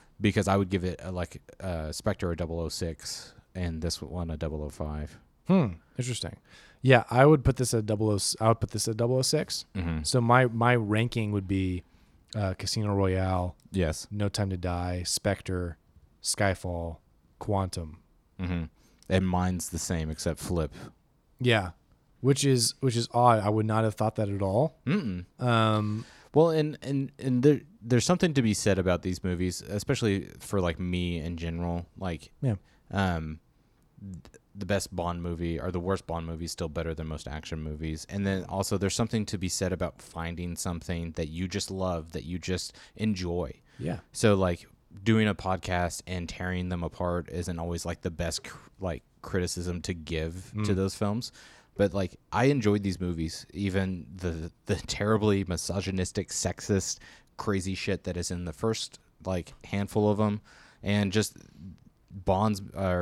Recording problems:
abrupt cut into speech; at the end

